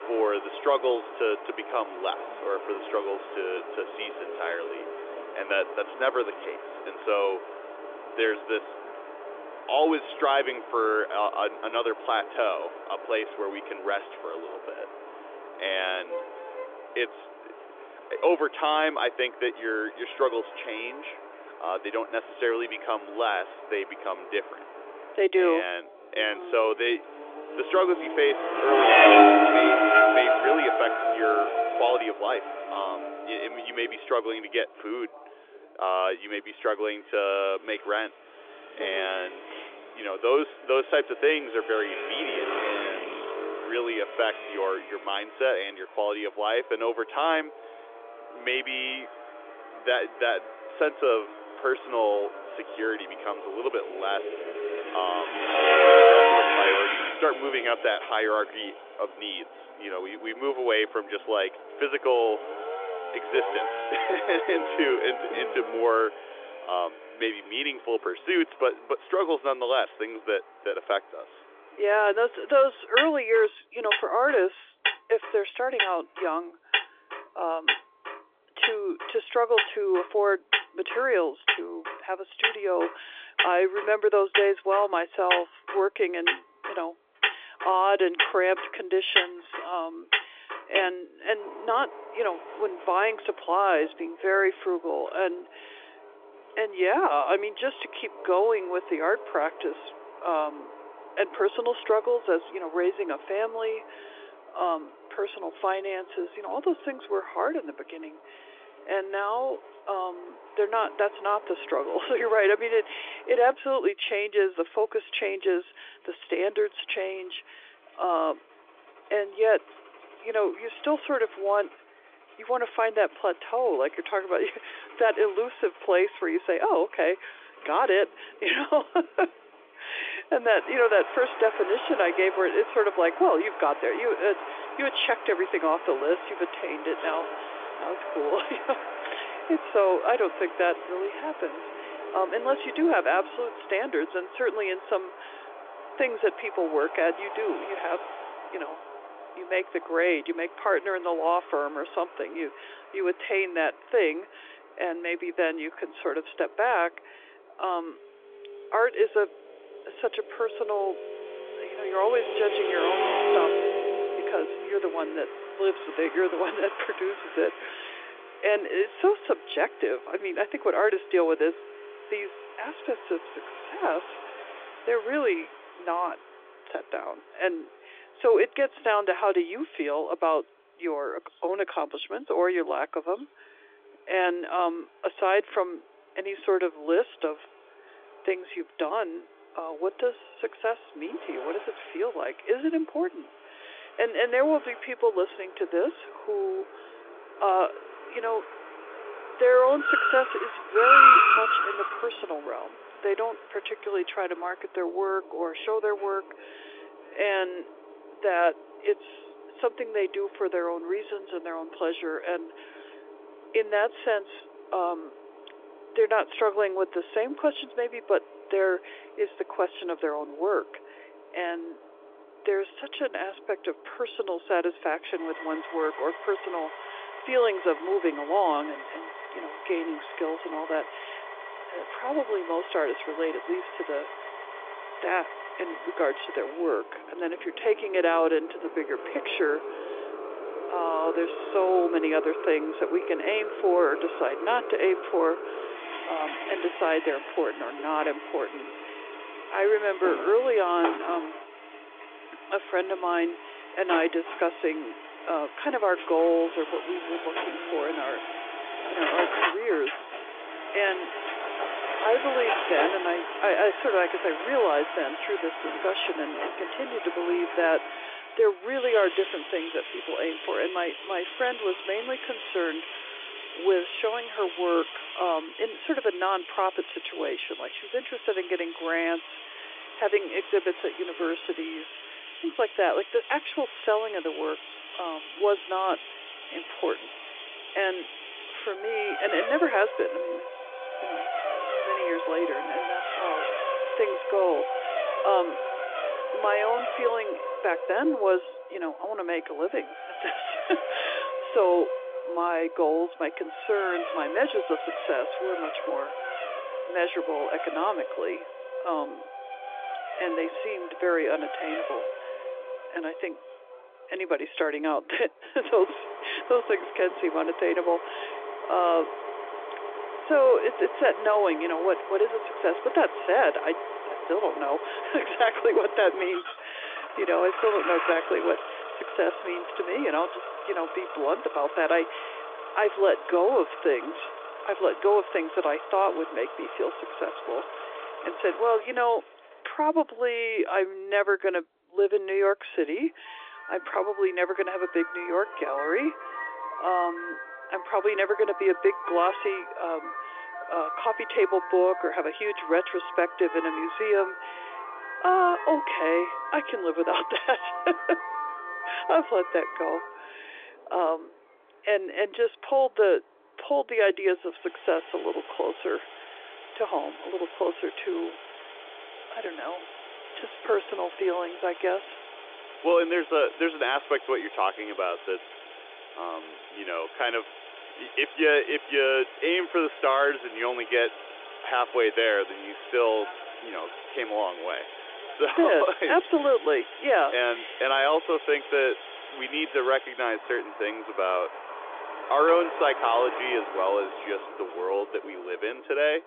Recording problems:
phone-call audio; nothing above 3.5 kHz
traffic noise; loud; throughout; 4 dB below the speech

